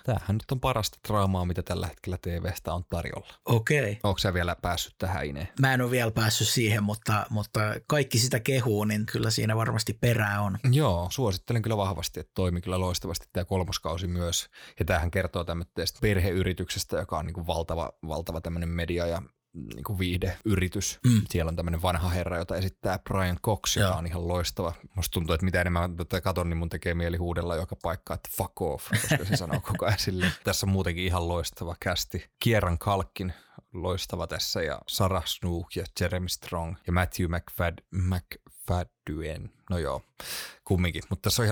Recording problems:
abrupt cut into speech; at the end

